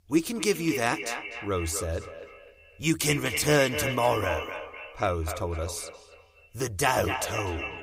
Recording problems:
echo of what is said; strong; throughout; 250 ms later, 7 dB below the speech

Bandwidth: 15.5 kHz